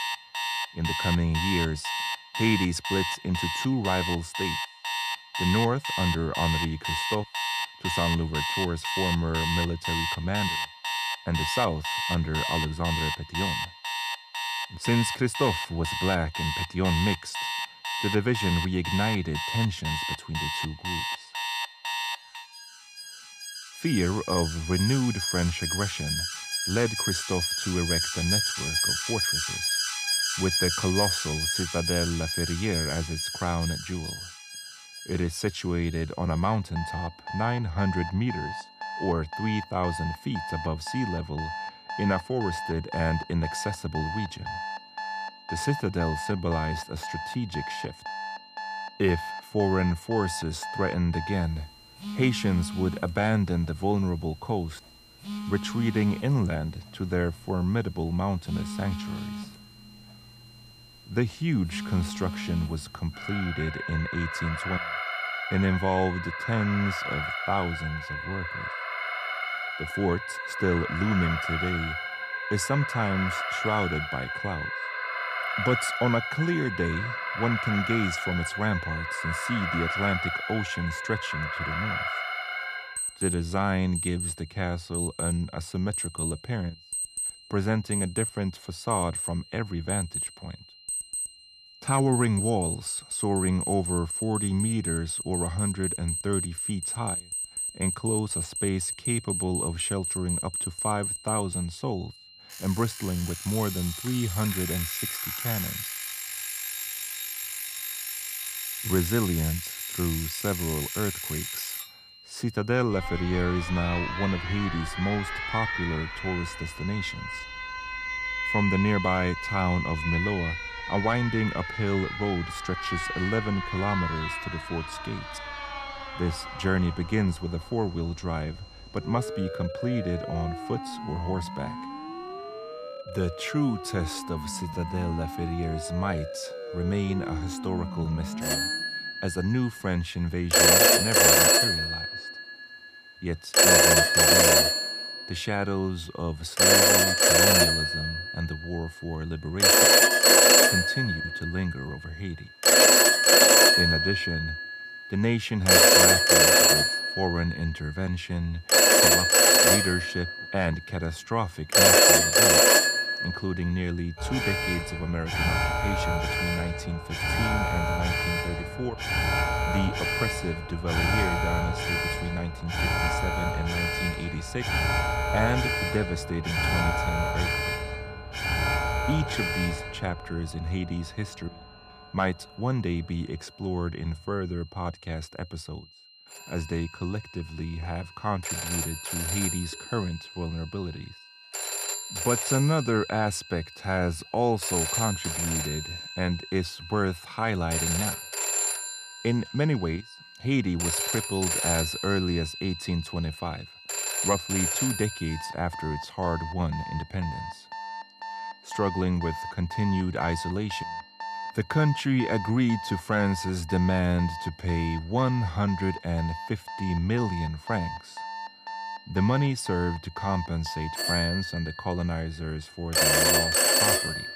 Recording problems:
alarms or sirens; very loud; throughout; 4 dB above the speech
high-pitched whine; faint; throughout; 4 kHz, 20 dB below the speech

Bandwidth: 15 kHz